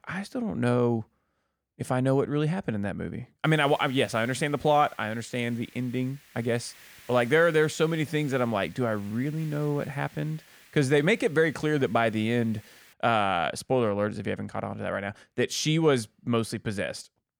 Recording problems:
hiss; faint; from 3.5 to 13 s; 25 dB below the speech

